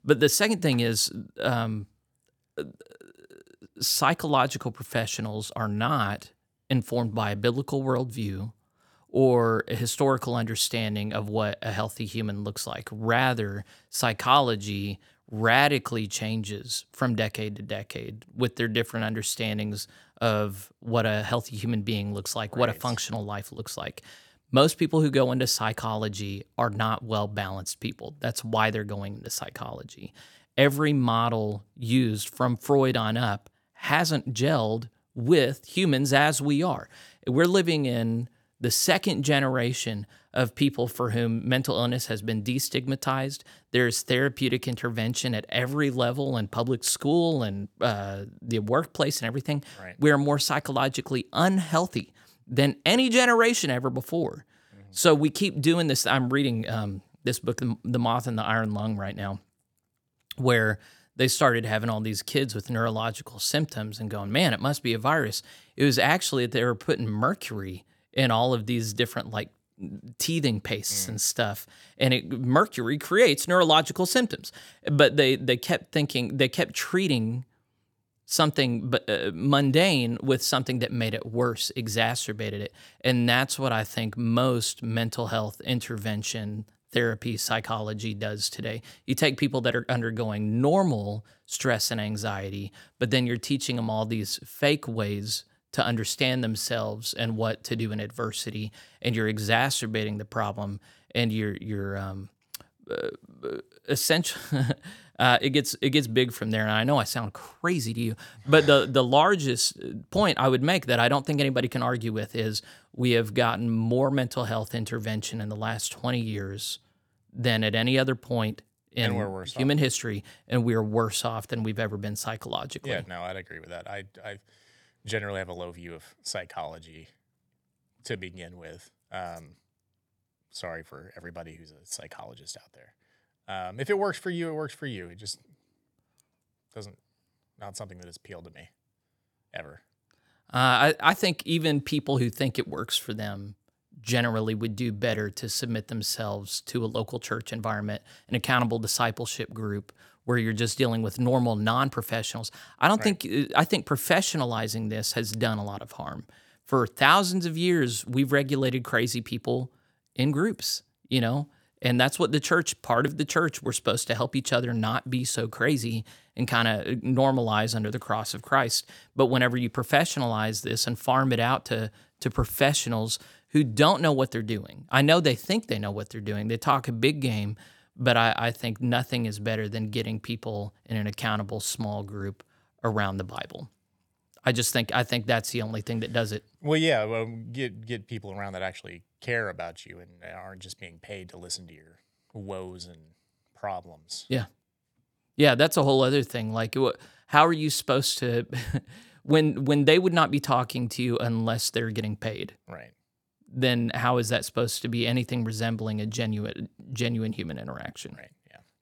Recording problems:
none

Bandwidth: 19 kHz